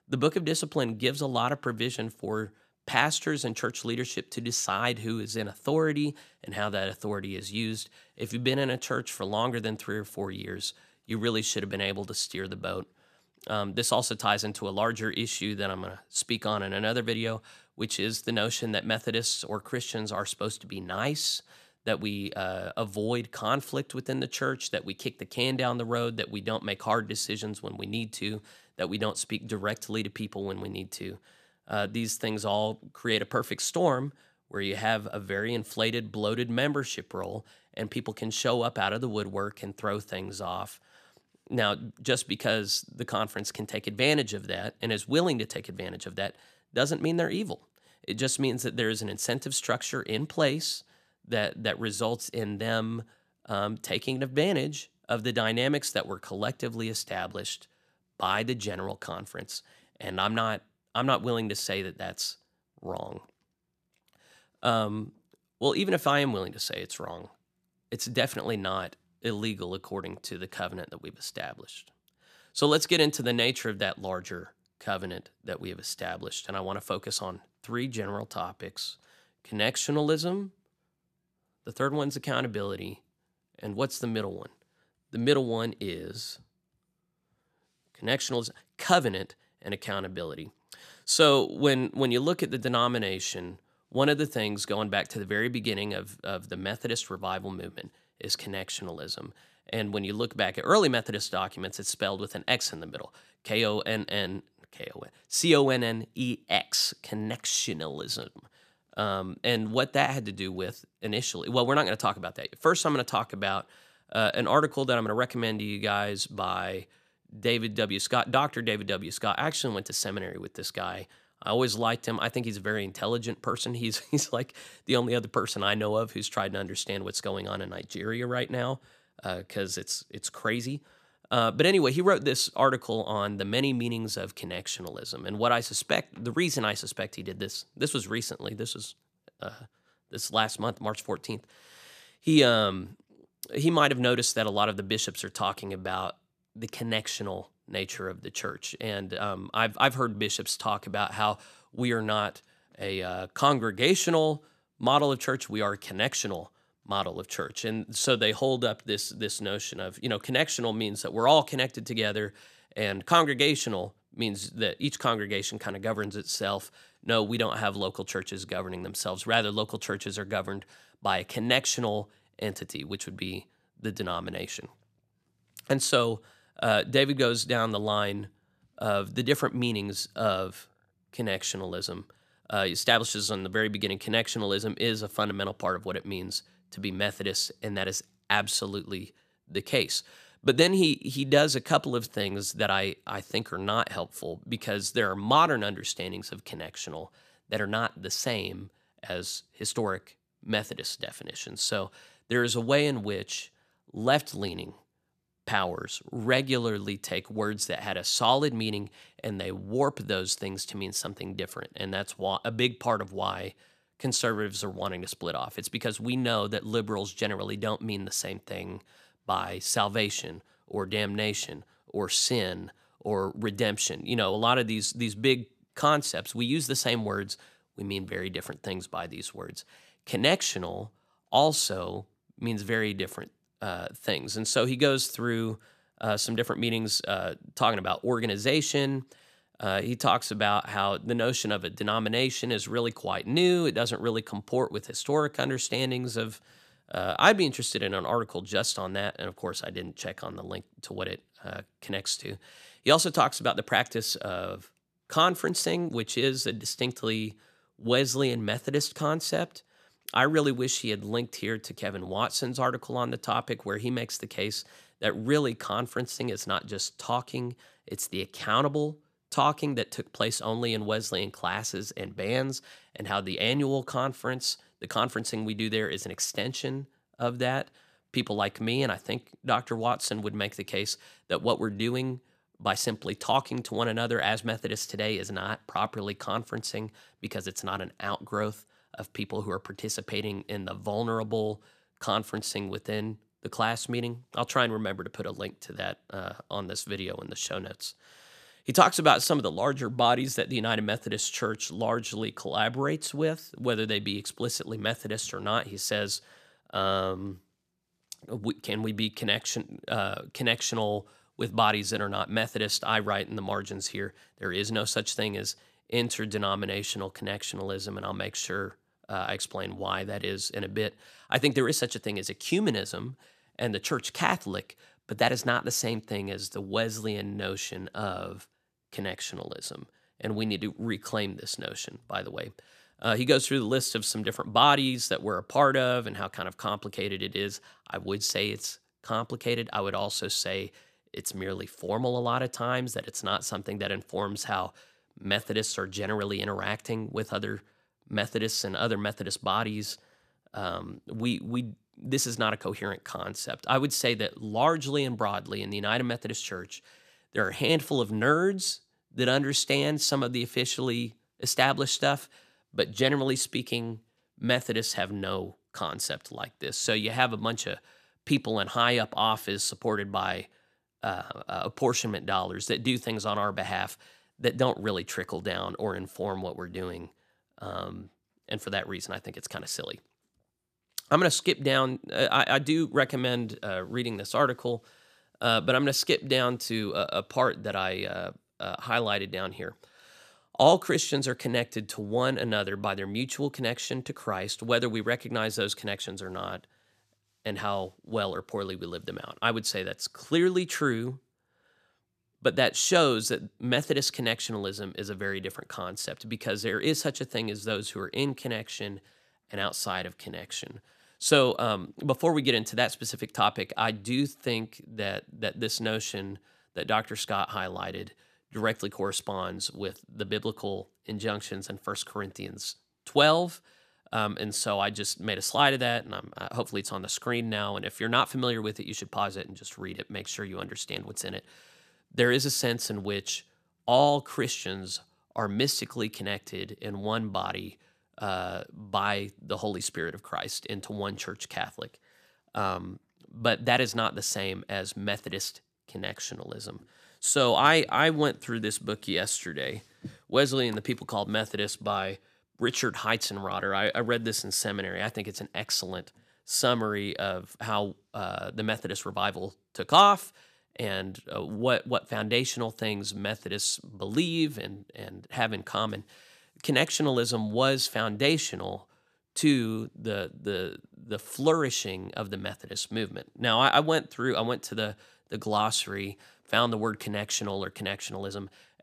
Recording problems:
none

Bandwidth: 14.5 kHz